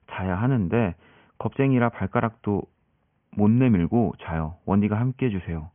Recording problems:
high frequencies cut off; severe; nothing above 3.5 kHz

